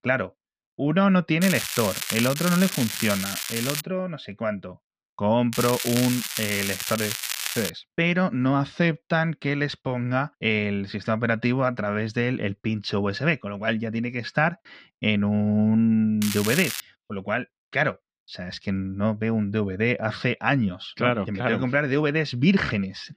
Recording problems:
muffled; very slightly; fading above 4 kHz
crackling; loud; from 1.5 to 4 s, from 5.5 to 7.5 s and at 16 s; 4 dB below the speech

